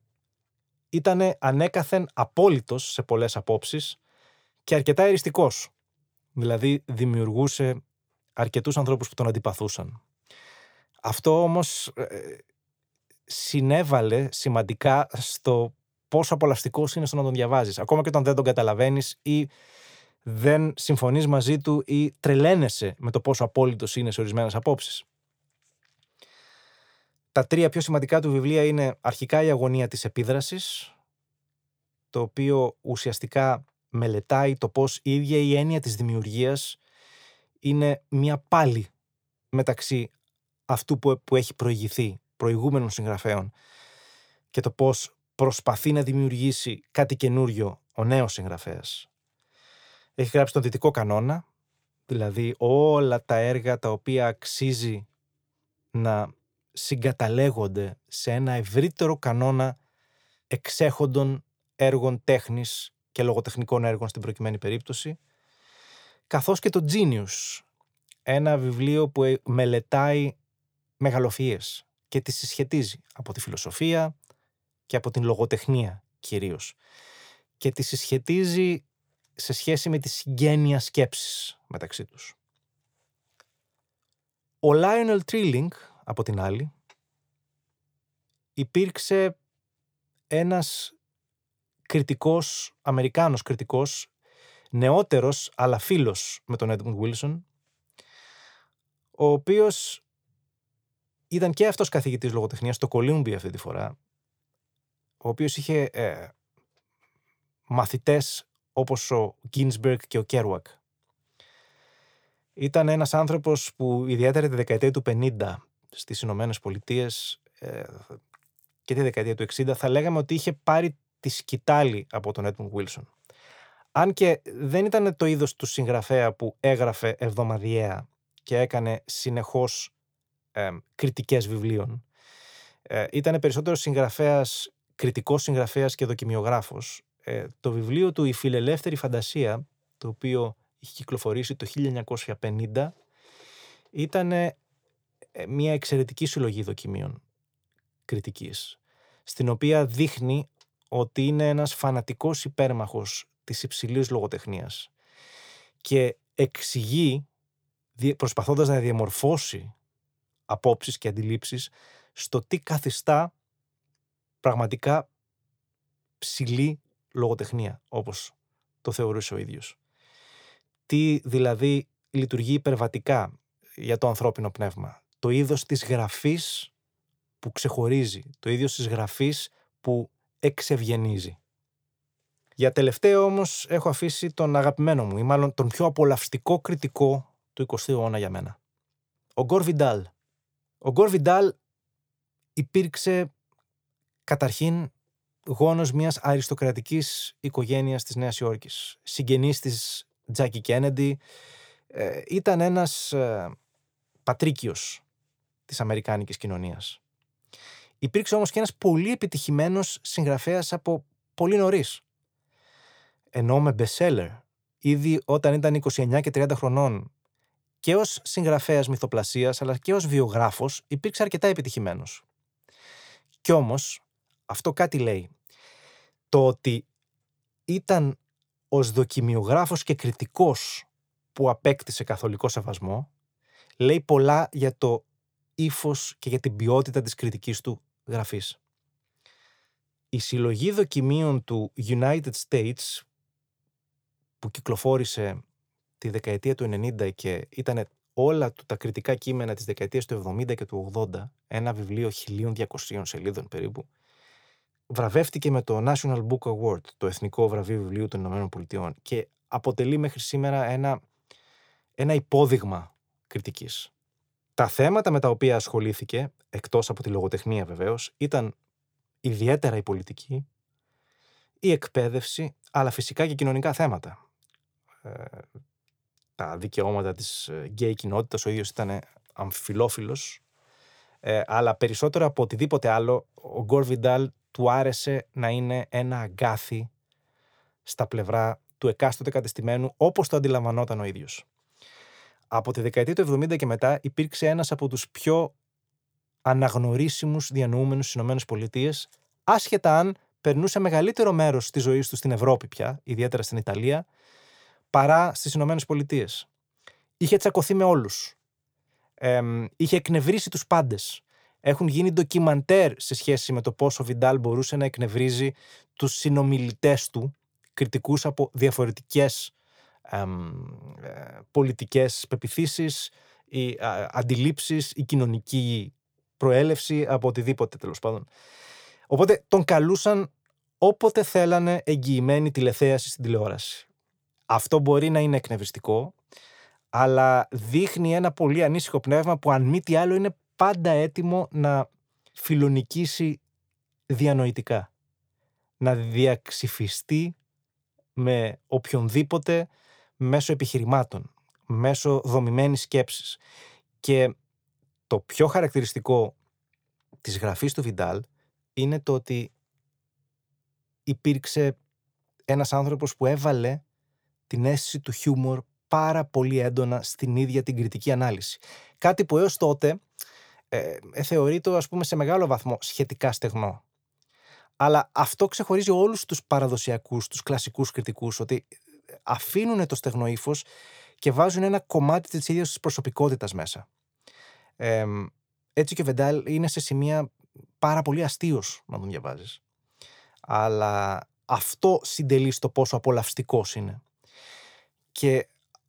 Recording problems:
none

